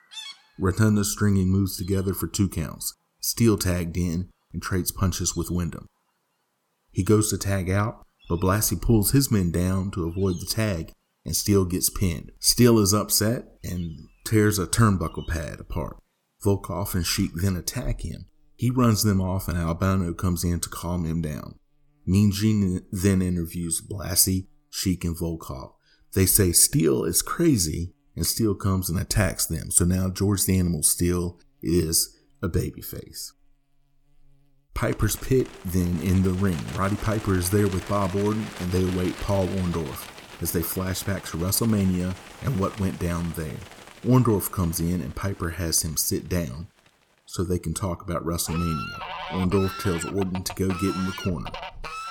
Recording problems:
animal sounds; noticeable; throughout; 15 dB below the speech

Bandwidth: 18 kHz